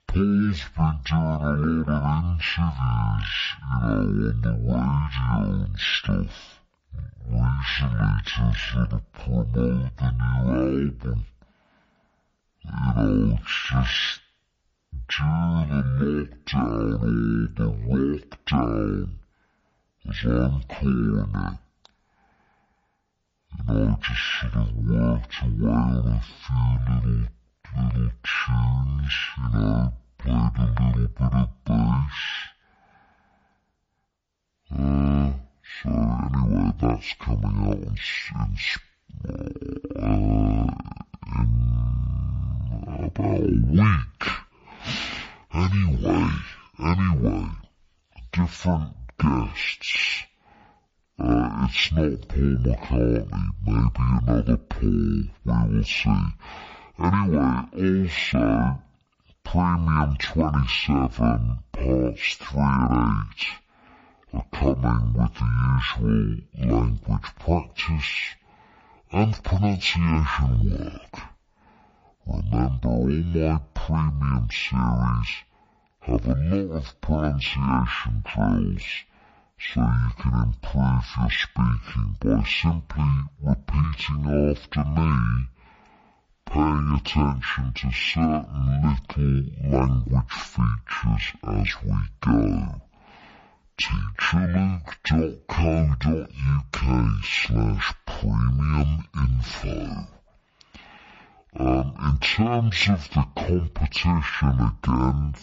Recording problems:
wrong speed and pitch; too slow and too low; 0.5 times normal speed

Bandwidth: 7.5 kHz